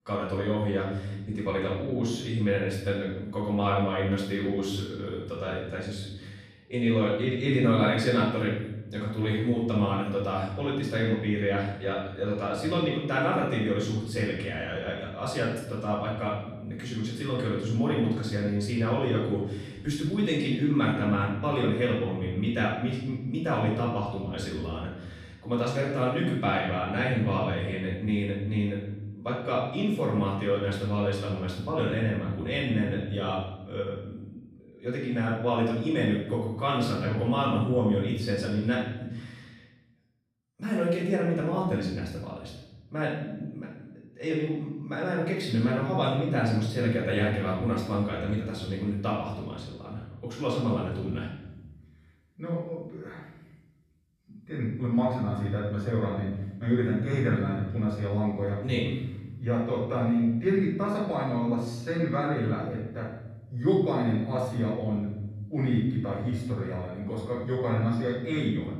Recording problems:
off-mic speech; far
room echo; noticeable; dies away in 1.1 s

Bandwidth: 14.5 kHz